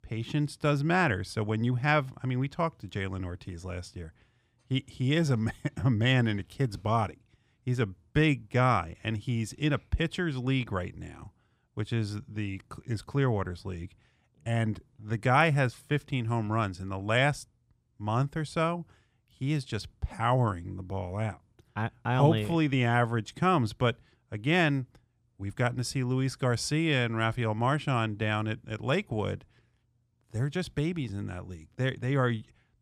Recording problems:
none

